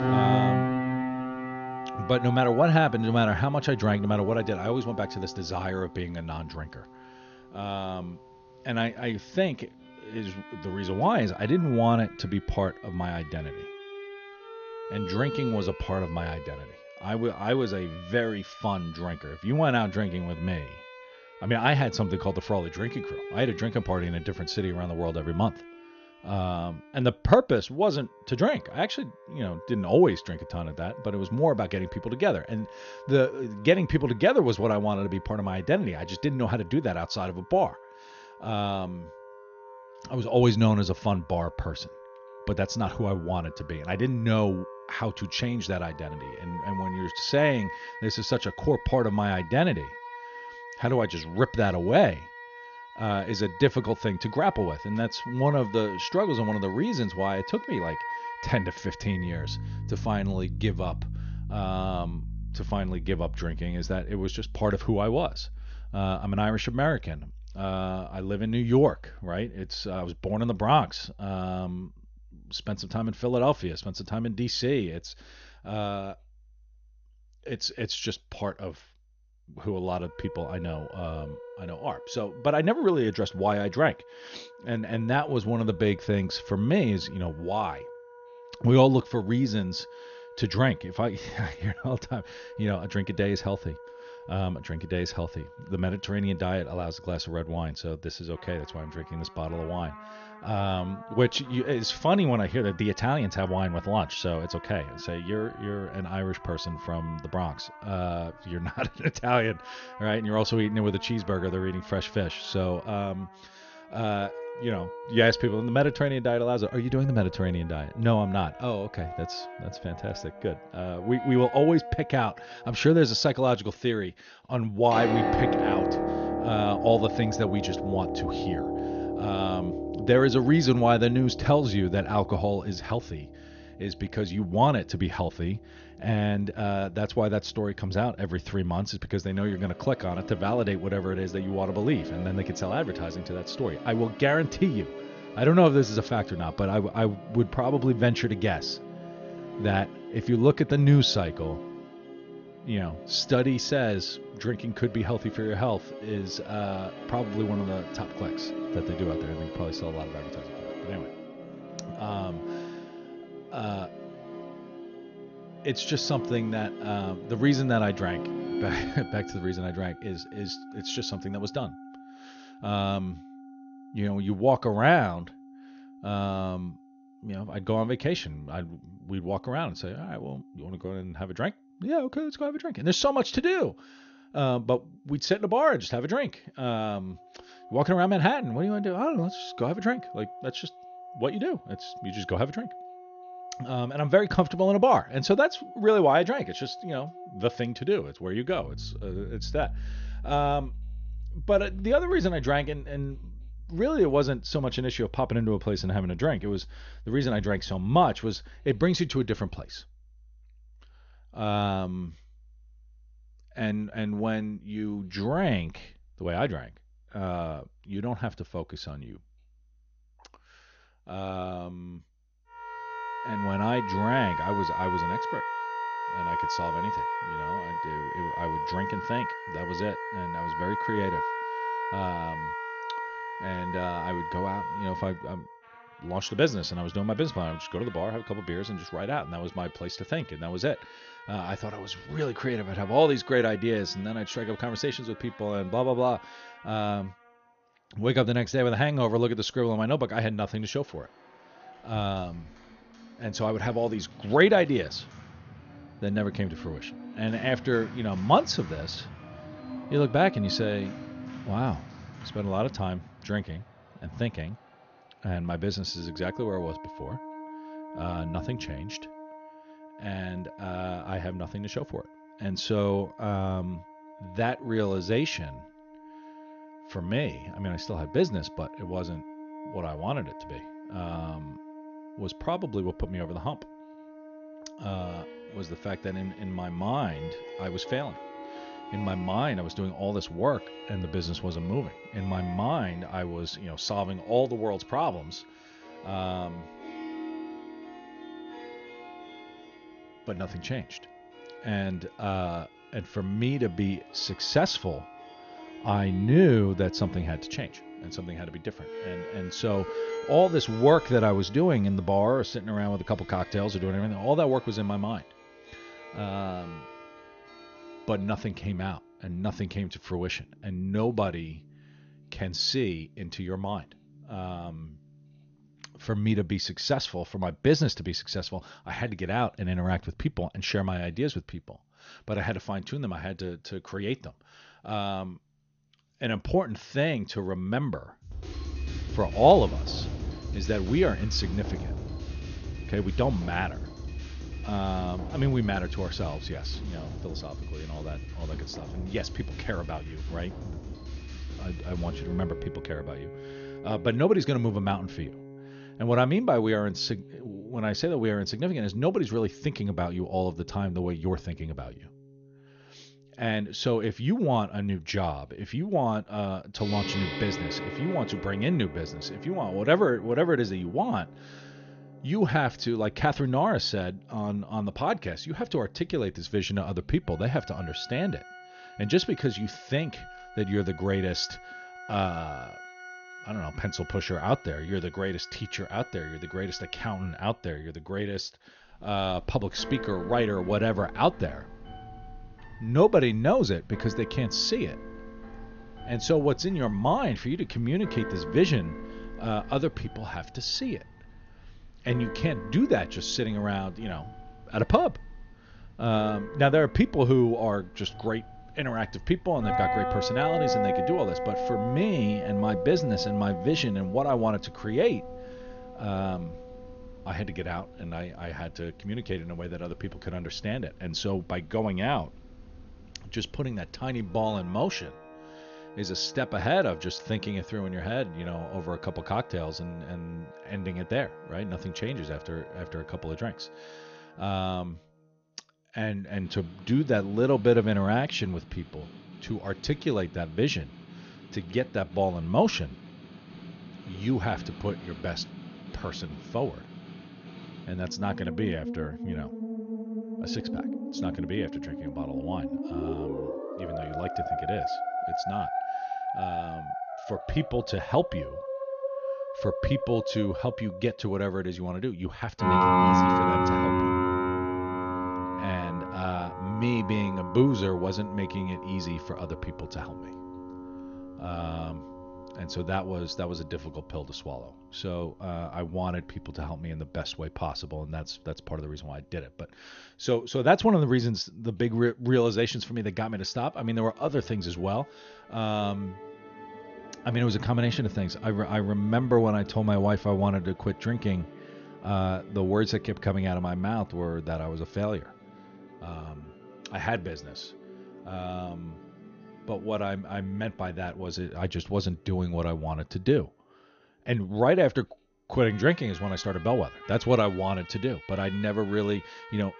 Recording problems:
garbled, watery; slightly; nothing above 6.5 kHz
background music; loud; throughout; 9 dB below the speech

